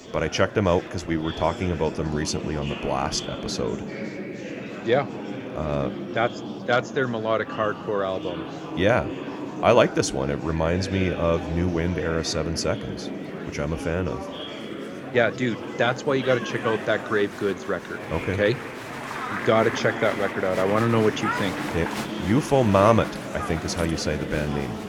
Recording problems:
murmuring crowd; loud; throughout; 8 dB below the speech

